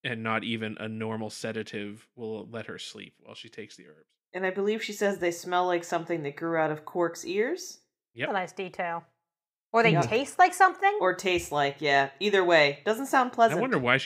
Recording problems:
abrupt cut into speech; at the end

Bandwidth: 15.5 kHz